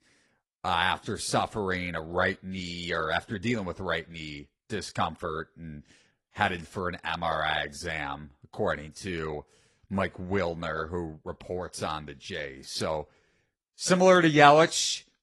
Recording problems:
garbled, watery; slightly; nothing above 11.5 kHz

